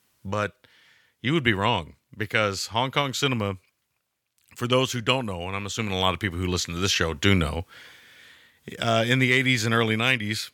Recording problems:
none

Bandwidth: 18.5 kHz